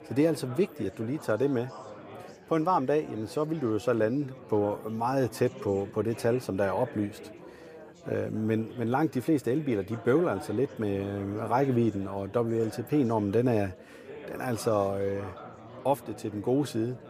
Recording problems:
chatter from many people; noticeable; throughout; 15 dB below the speech

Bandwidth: 15 kHz